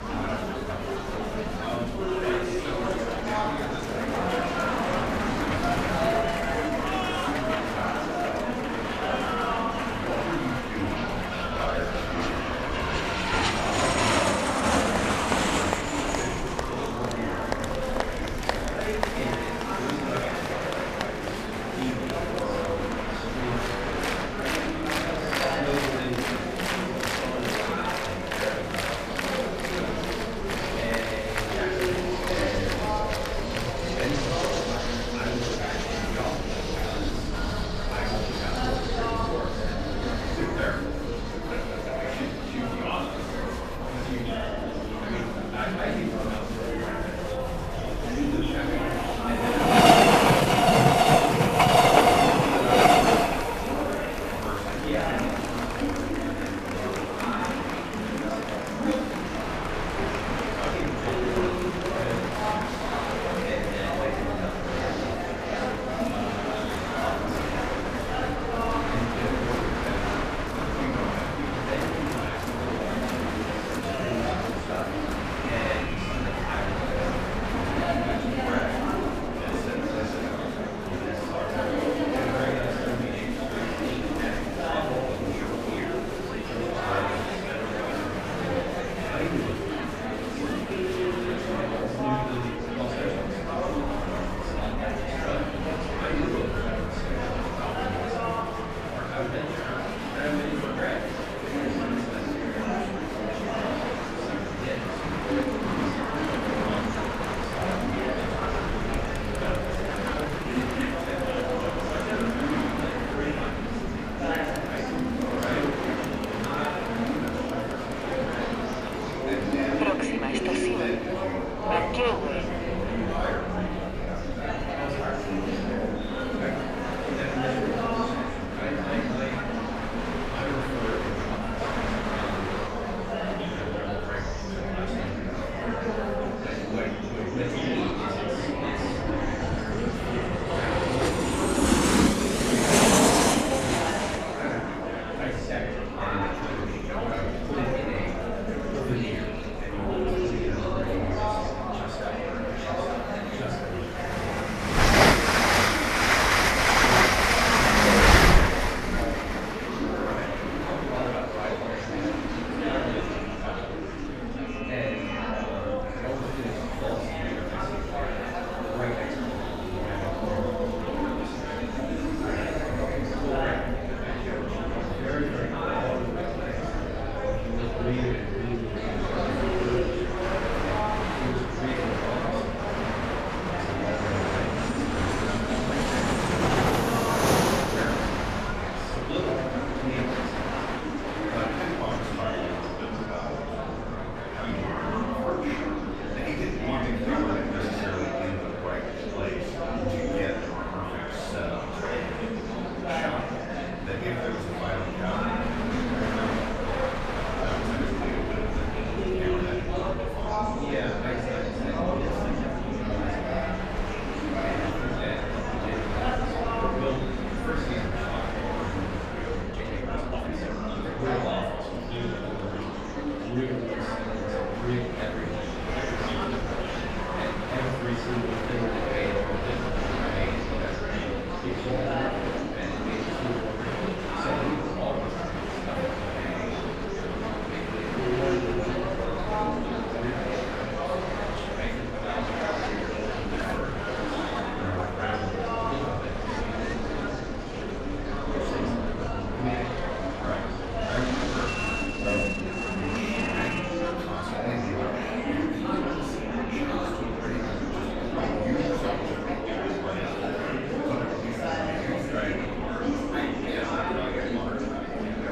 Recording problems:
off-mic speech; far
room echo; noticeable; dies away in 0.6 s
train or aircraft noise; very loud; throughout; 6 dB above the speech
murmuring crowd; very loud; throughout; 4 dB above the speech
low rumble; faint; throughout; 20 dB below the speech
uneven, jittery; strongly; from 1:14 to 3:46

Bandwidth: 14.5 kHz